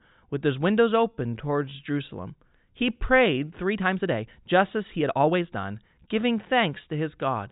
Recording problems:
high frequencies cut off; severe; nothing above 4 kHz
uneven, jittery; strongly; from 1 to 6.5 s

